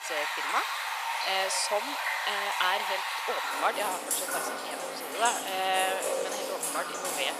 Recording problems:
thin; very; fading below 500 Hz
rain or running water; very loud; throughout; 1 dB above the speech

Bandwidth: 14.5 kHz